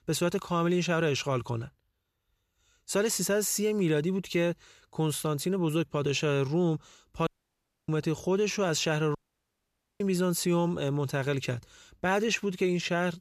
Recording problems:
audio cutting out; at 7.5 s for 0.5 s and at 9 s for 1 s

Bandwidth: 14.5 kHz